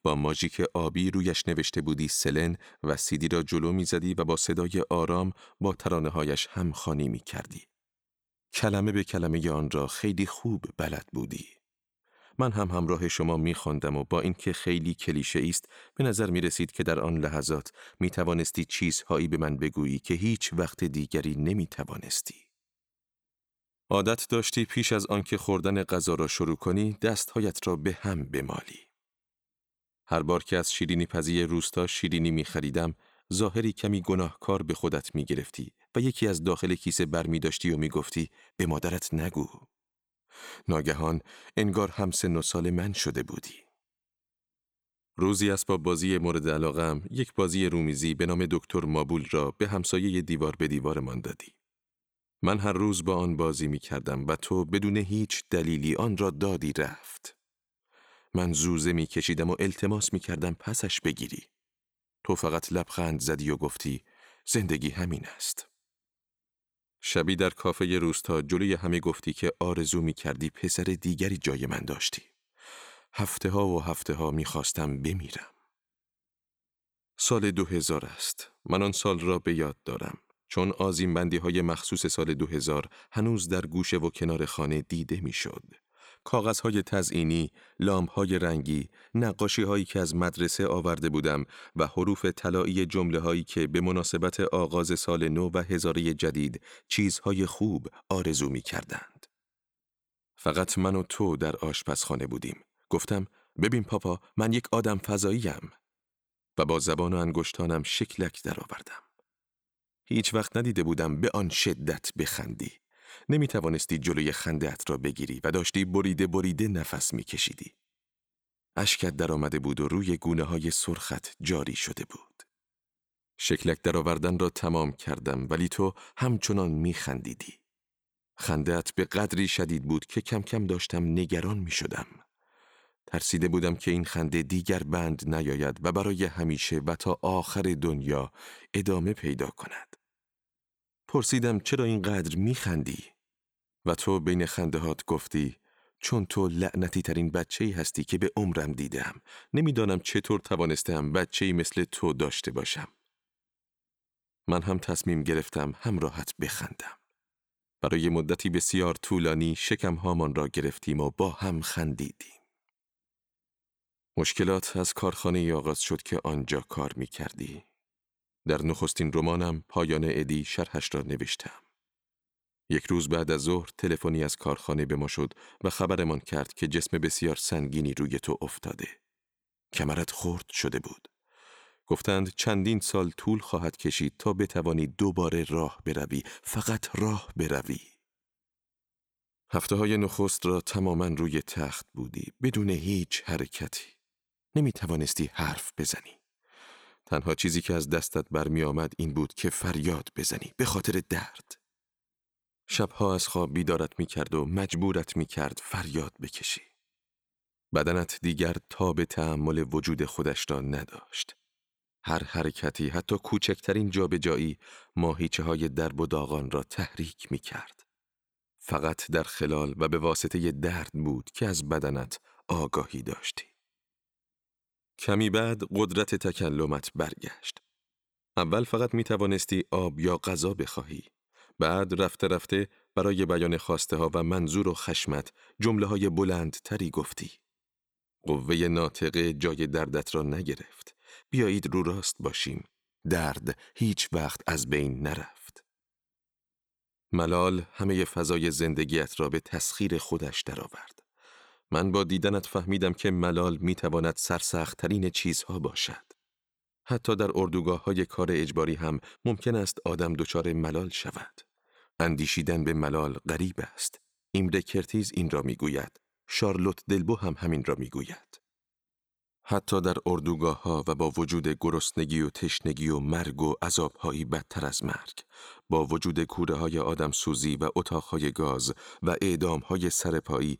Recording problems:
none

